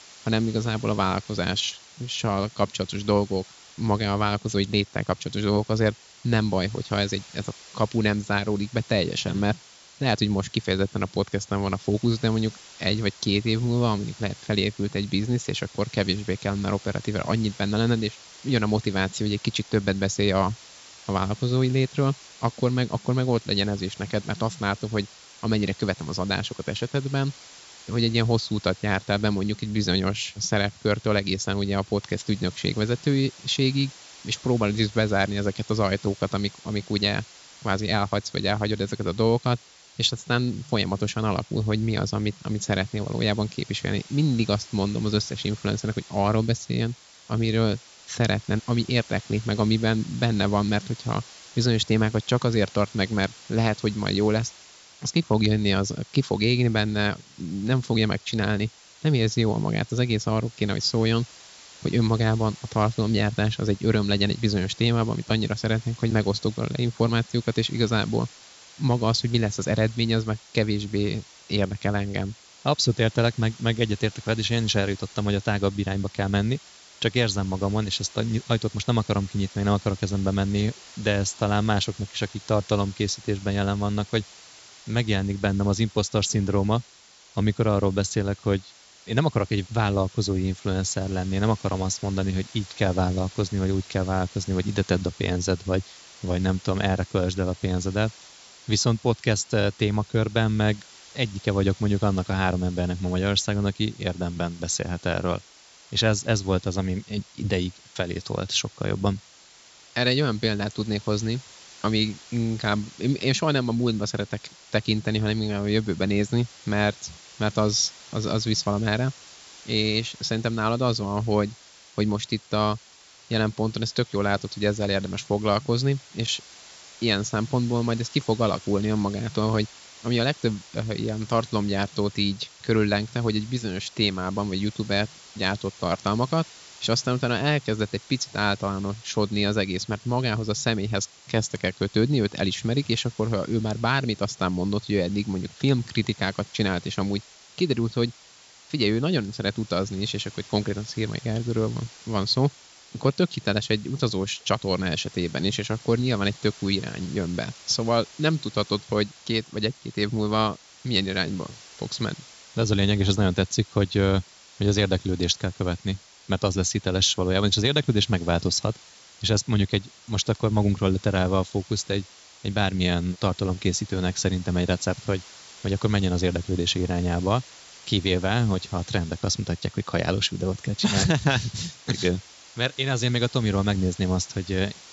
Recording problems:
high frequencies cut off; noticeable; nothing above 8 kHz
hiss; faint; throughout; 20 dB below the speech

